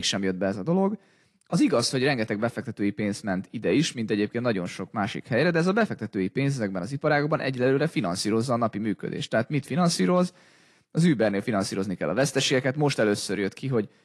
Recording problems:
garbled, watery; slightly
abrupt cut into speech; at the start

